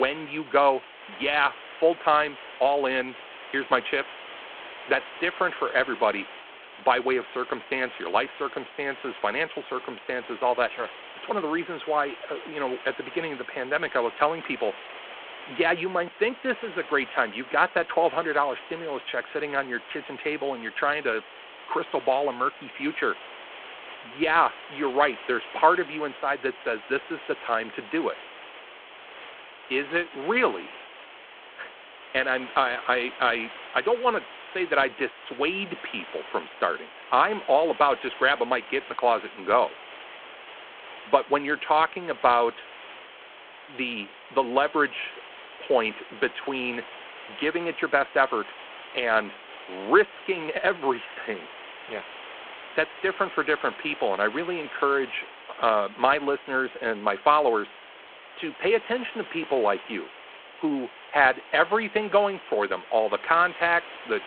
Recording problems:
phone-call audio
hiss; noticeable; throughout; 15 dB below the speech
abrupt cut into speech; at the start

